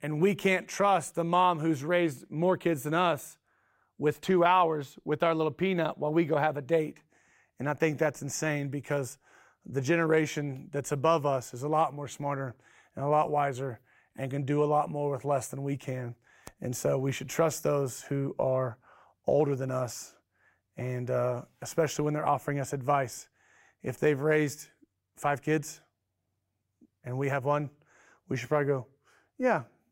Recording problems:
none

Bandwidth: 16 kHz